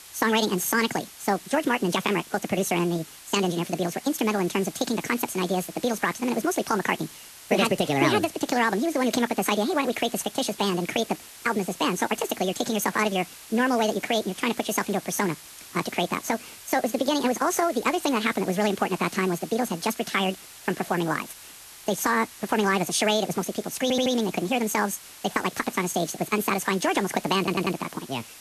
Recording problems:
wrong speed and pitch; too fast and too high; 1.7 times normal speed
garbled, watery; slightly; nothing above 14 kHz
hiss; noticeable; throughout; 15 dB below the speech
audio stuttering; at 24 s and at 27 s

